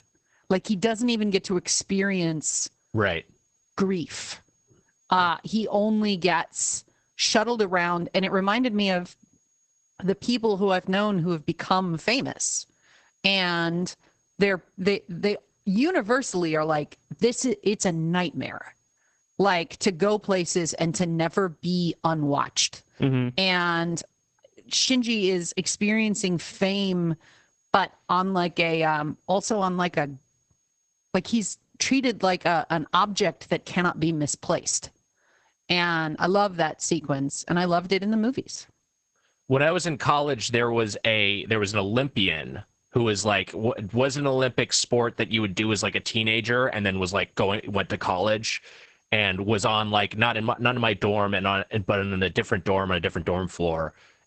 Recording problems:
garbled, watery; badly; nothing above 8 kHz
squashed, flat; somewhat
high-pitched whine; very faint; throughout; 6.5 kHz, 45 dB below the speech

